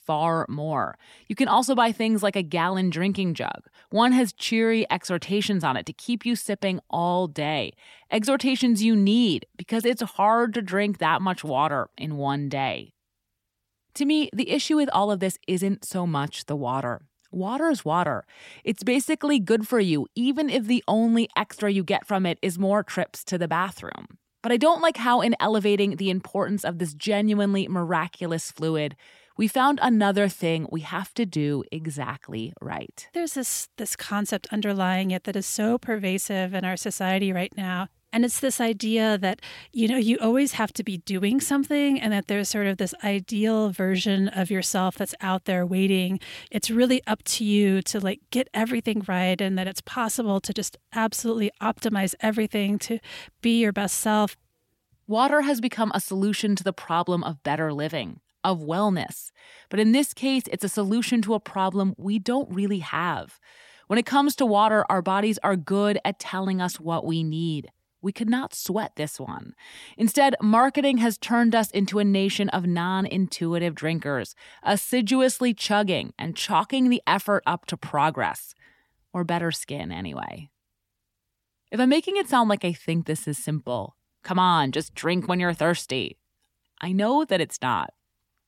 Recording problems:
none

